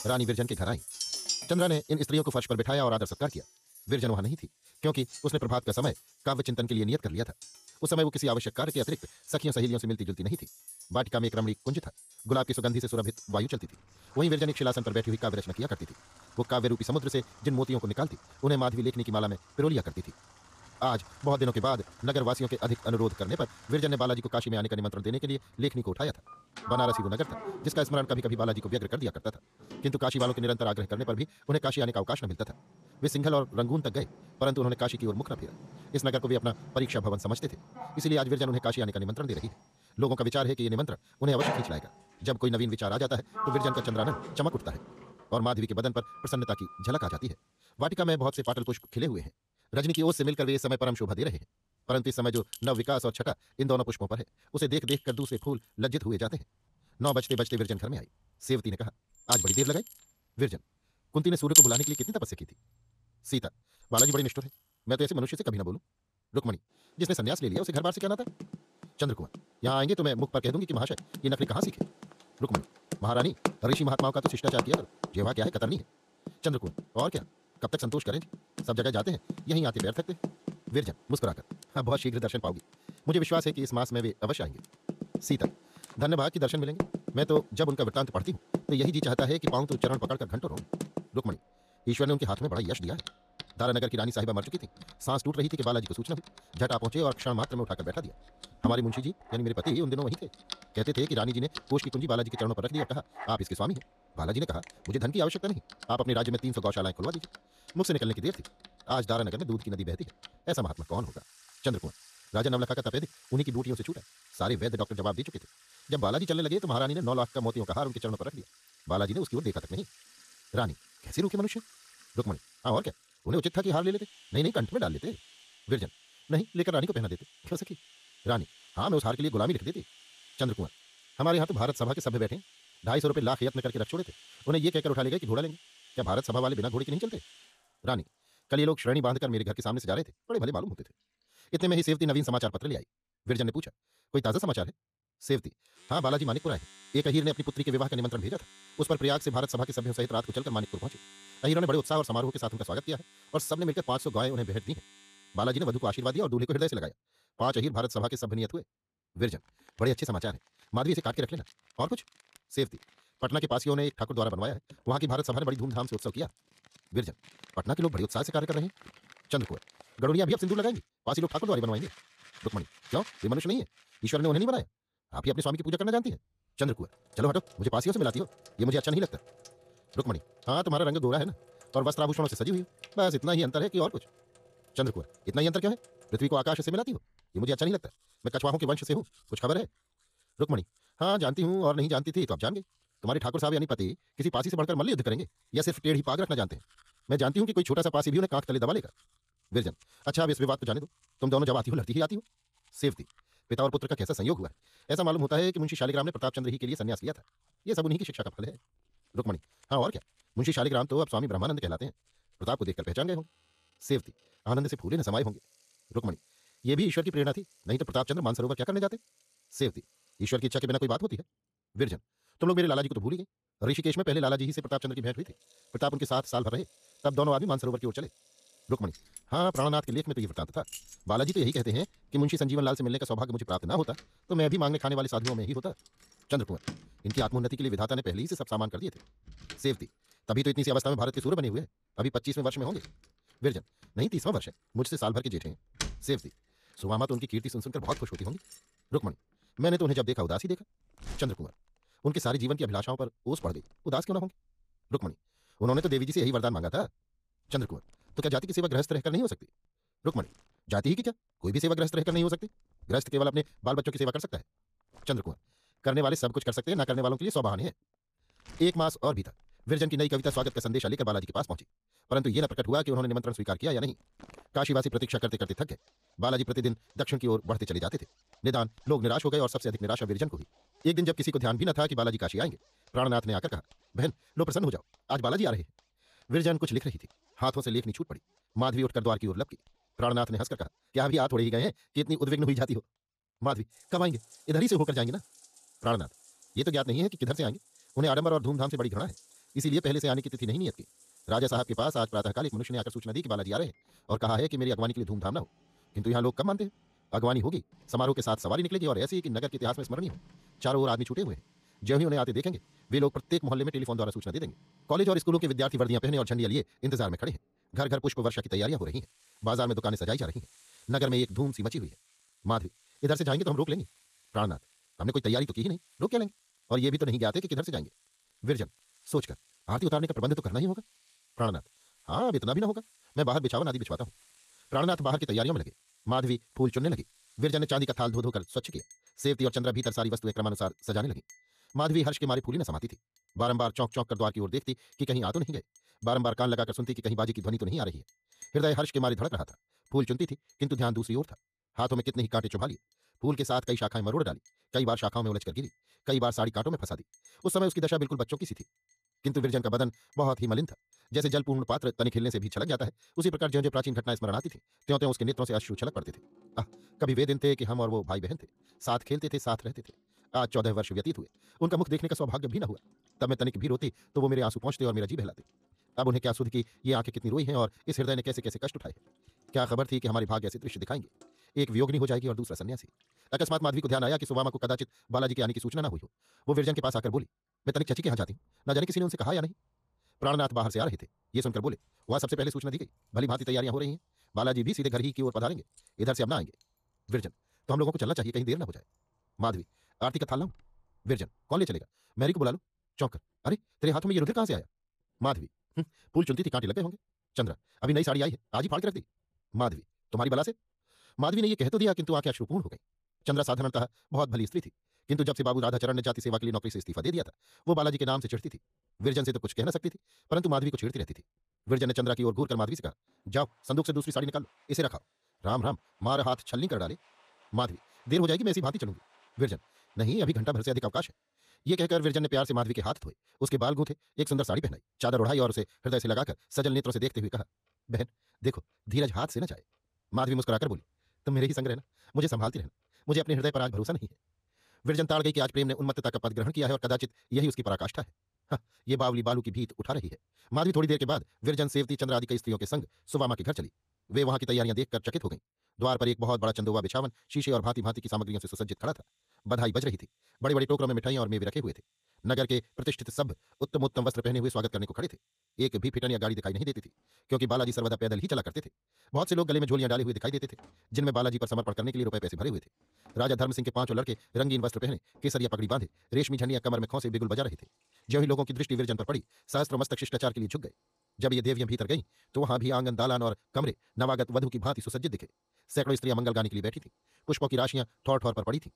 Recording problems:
wrong speed, natural pitch; too fast; 1.8 times normal speed
household noises; loud; throughout; 8 dB below the speech

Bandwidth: 14.5 kHz